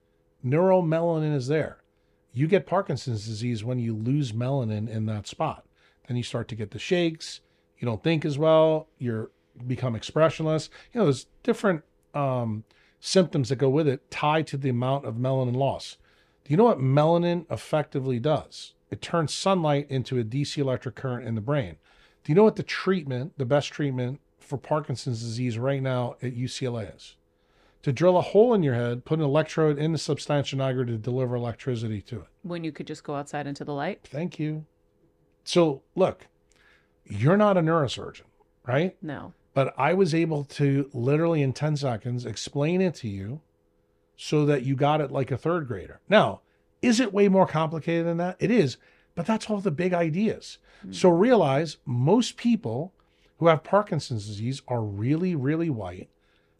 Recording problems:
none

